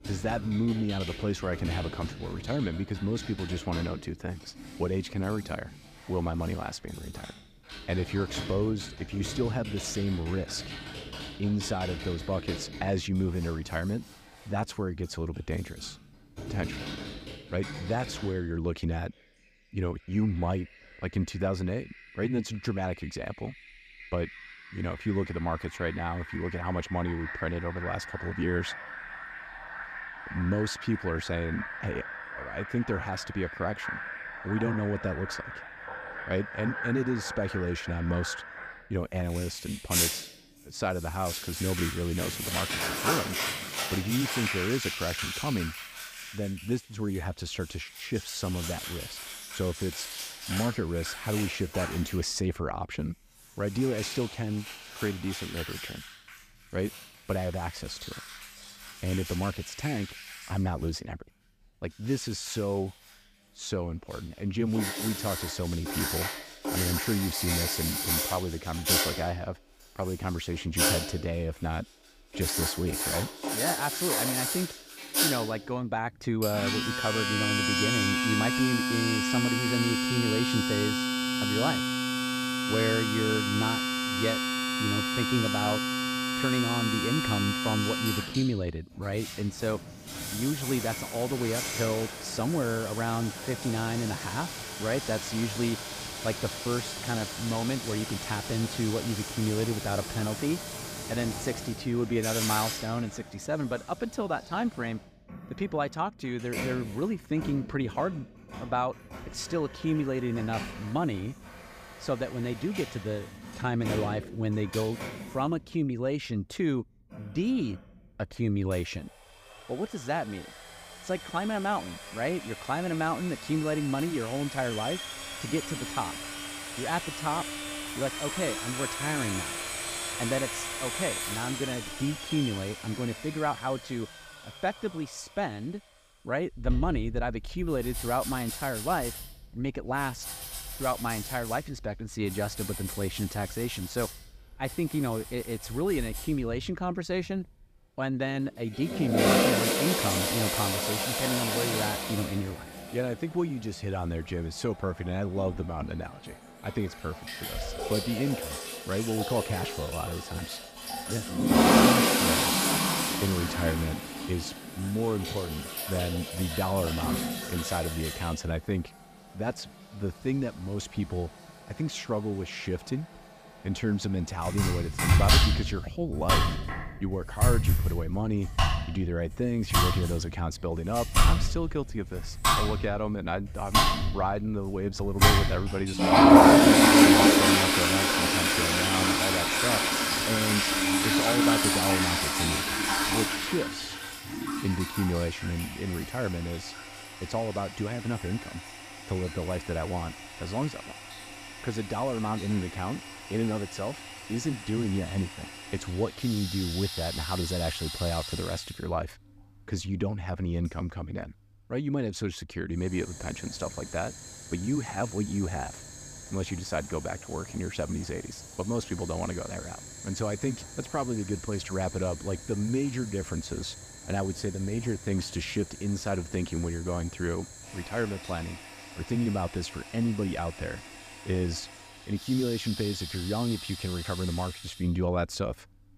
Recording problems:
household noises; very loud; throughout; 3 dB above the speech

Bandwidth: 15 kHz